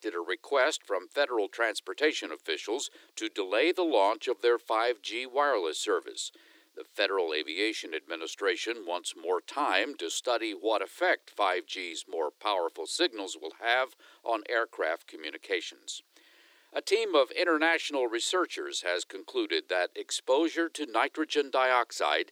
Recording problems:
thin; very; fading below 300 Hz

